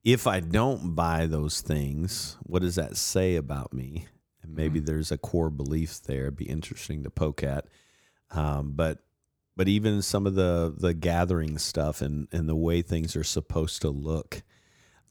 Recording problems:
none

